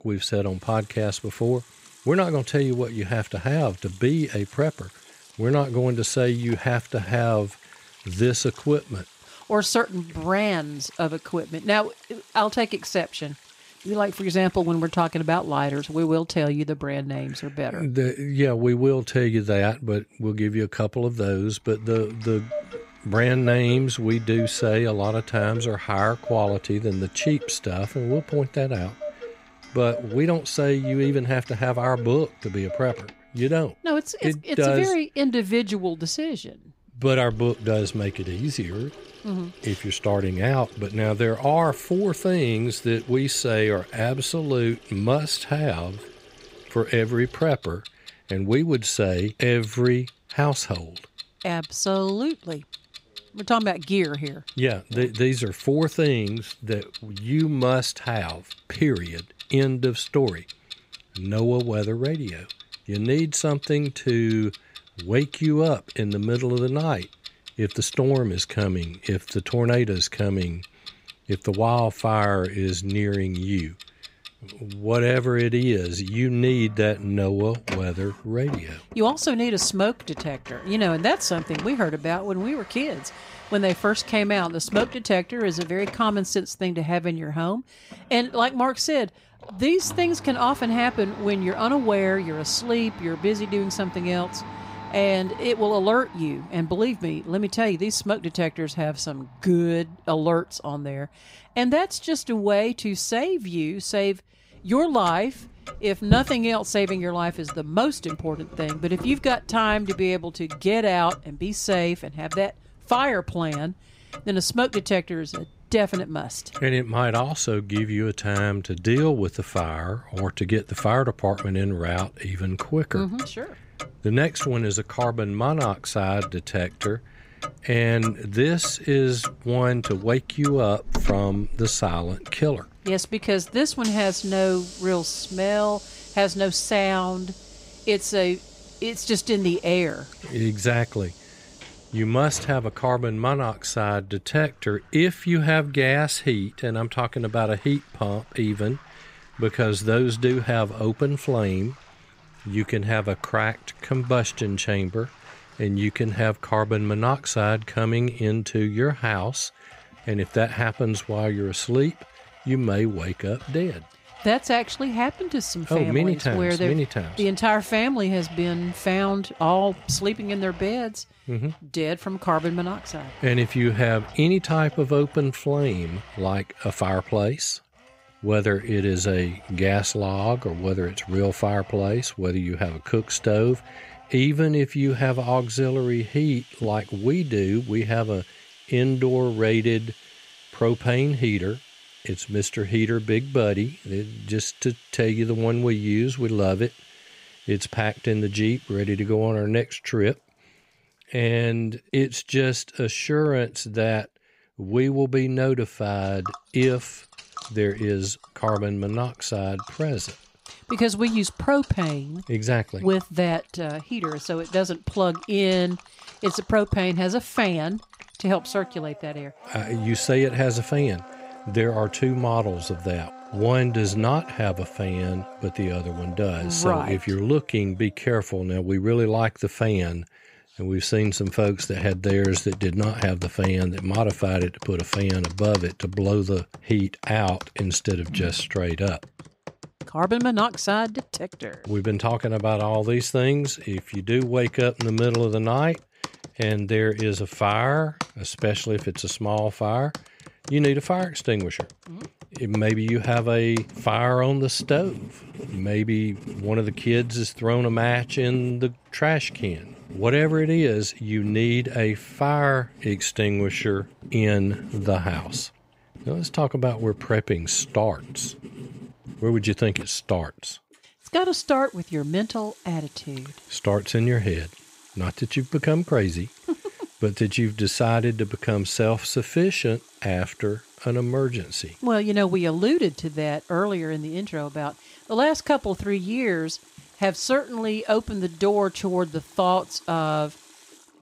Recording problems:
household noises; noticeable; throughout; 15 dB below the speech

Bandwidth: 15.5 kHz